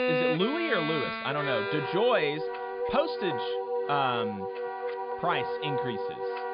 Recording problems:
high frequencies cut off; severe; nothing above 5 kHz
background music; loud; throughout; 2 dB below the speech

